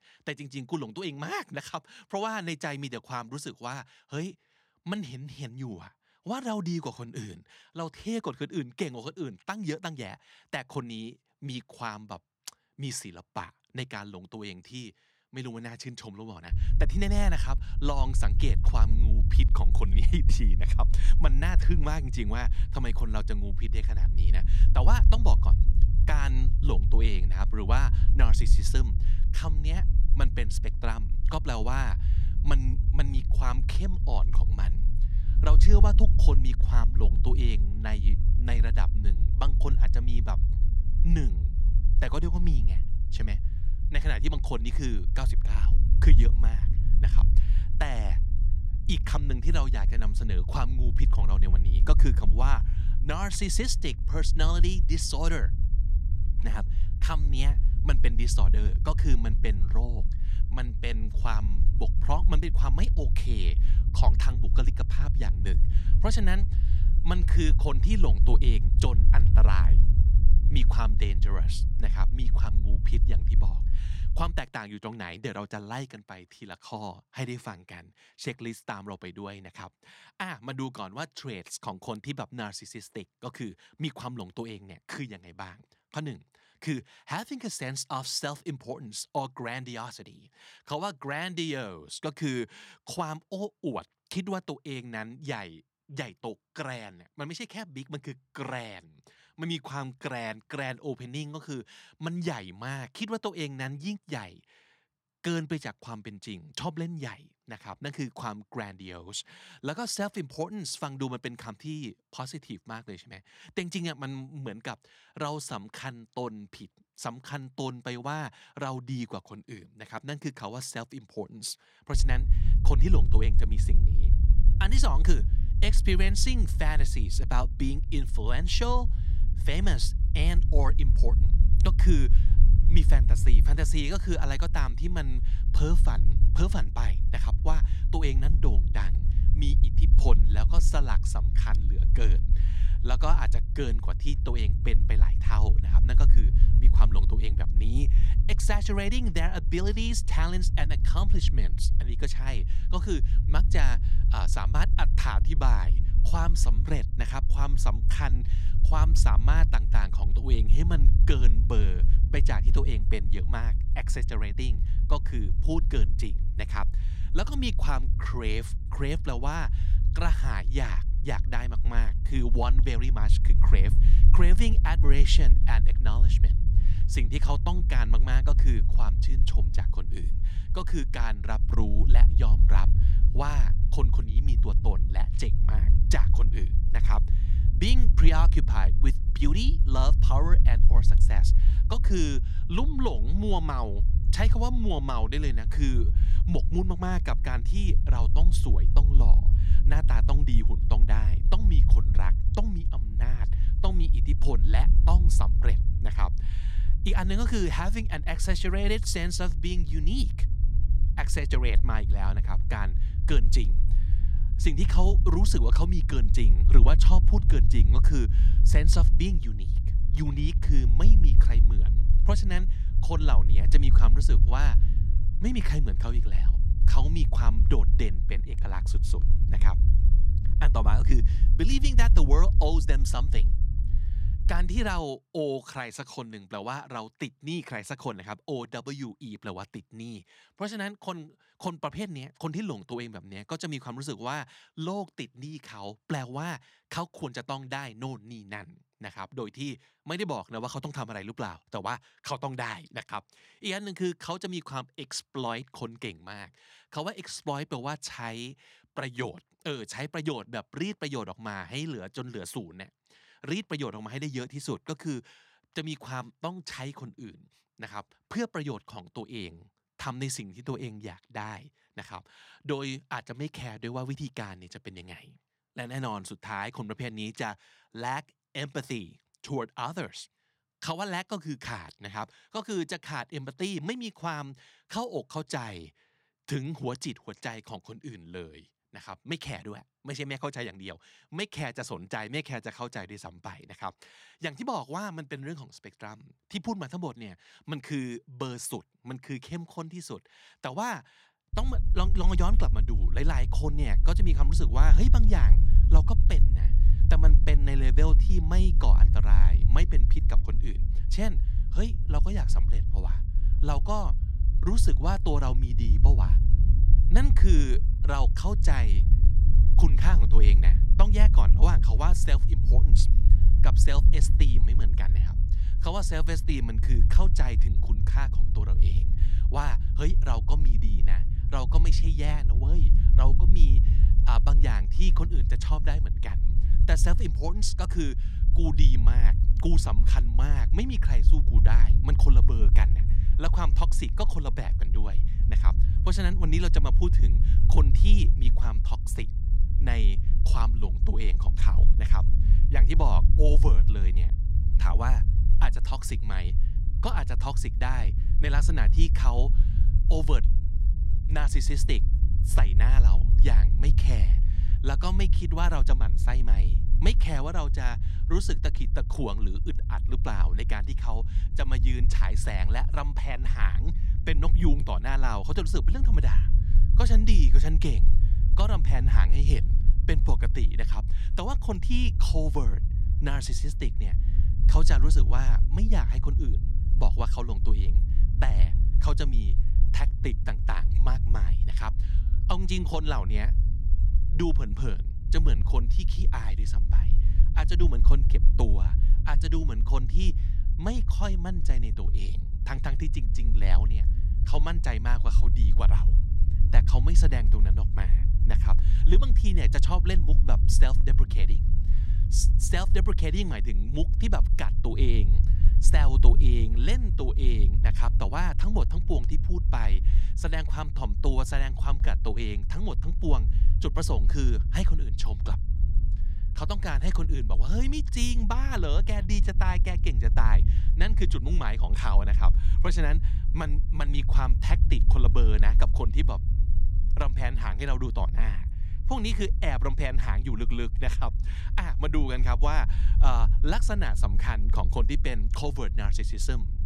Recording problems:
low rumble; loud; from 17 s to 1:14, from 2:02 to 3:55 and from 5:01 on; 10 dB below the speech

